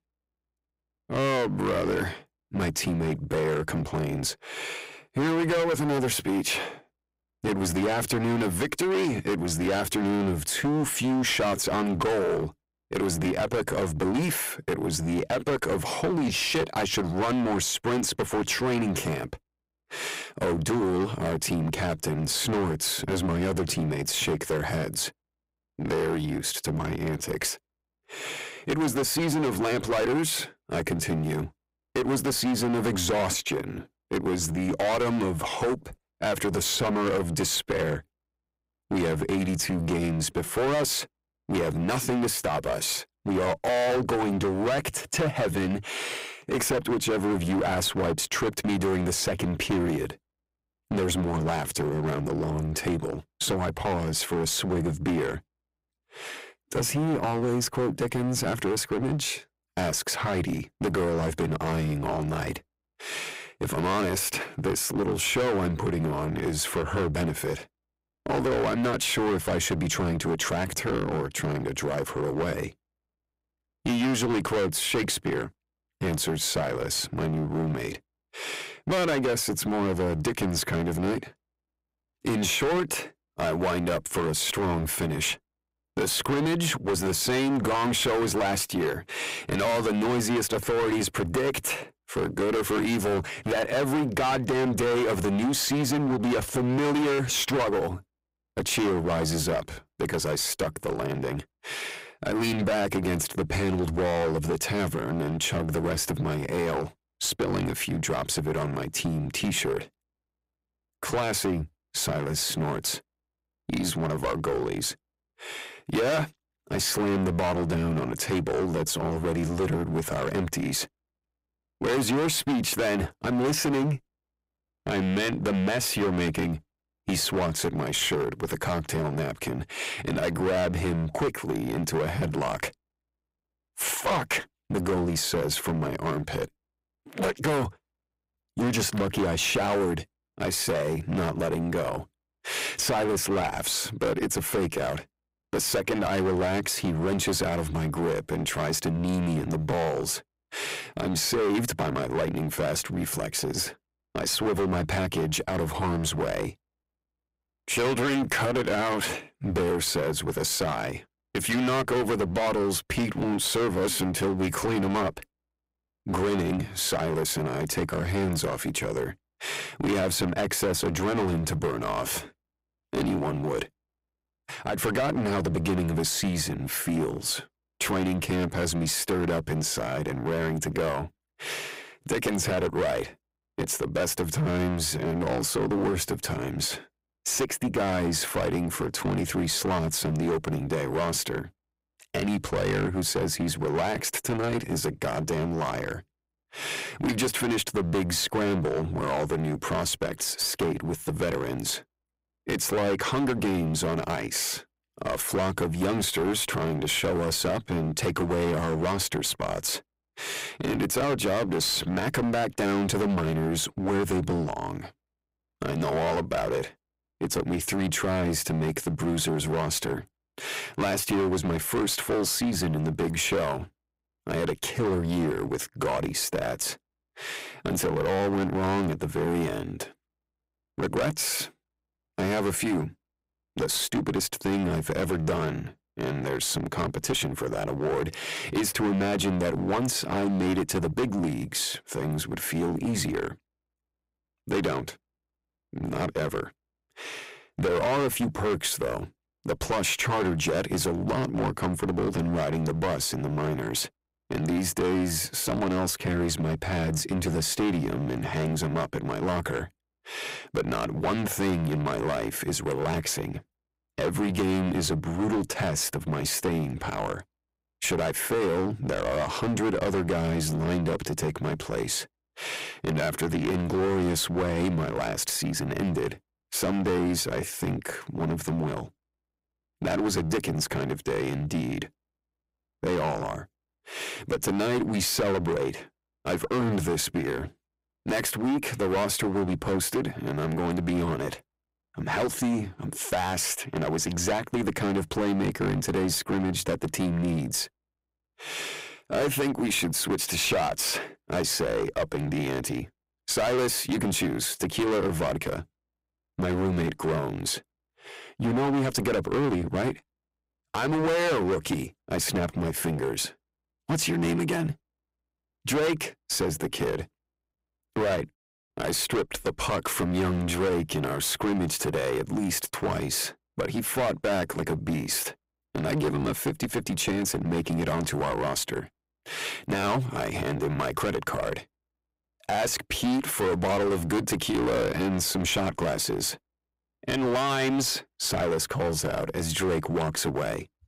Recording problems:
distortion; heavy; 16% of the sound clipped

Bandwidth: 15.5 kHz